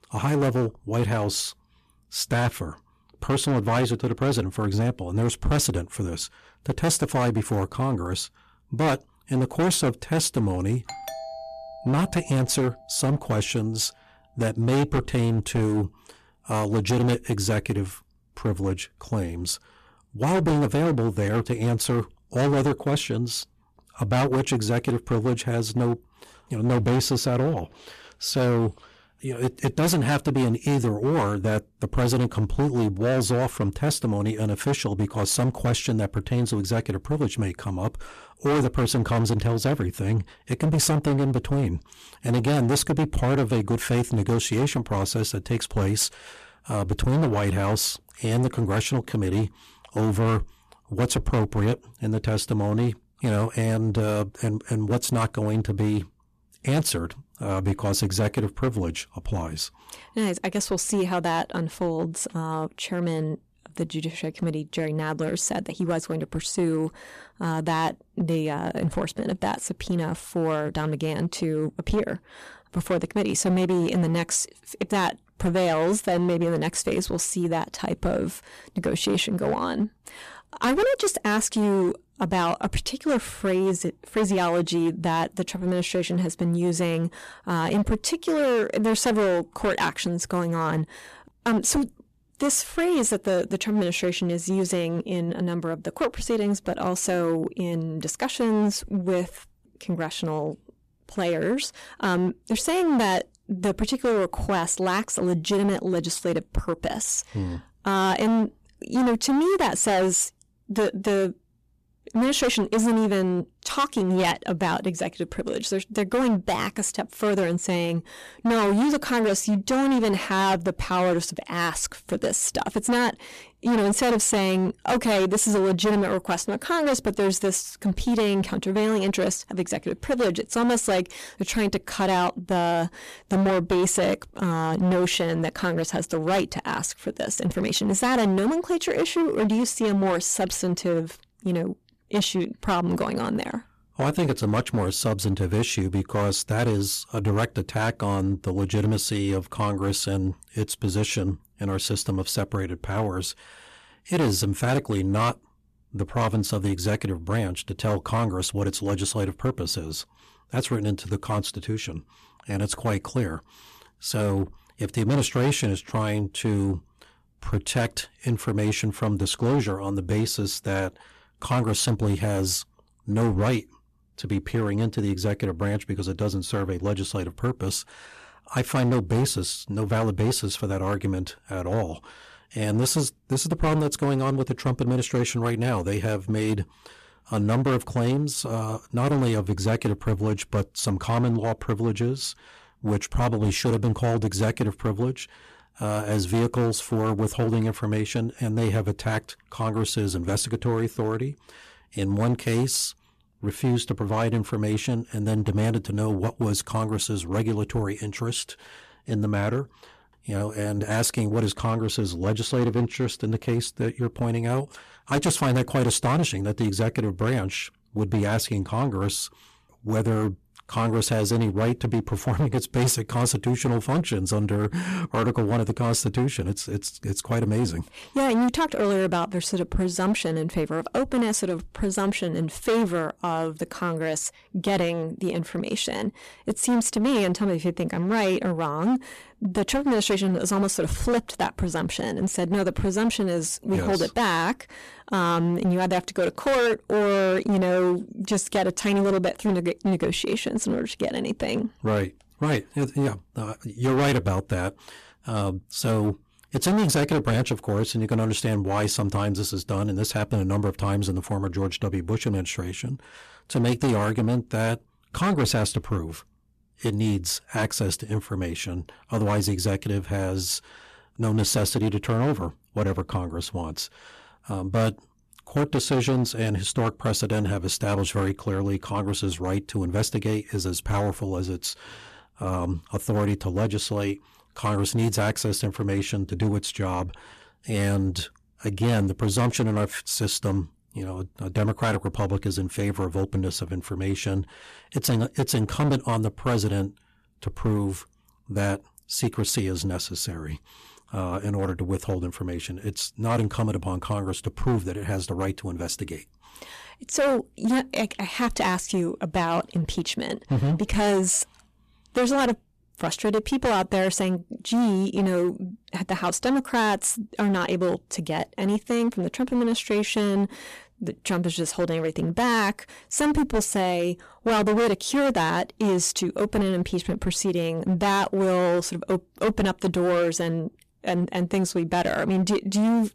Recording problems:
distortion; heavy; 11% of the sound clipped
doorbell; faint; from 11 to 13 s; peak 10 dB below the speech

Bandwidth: 14.5 kHz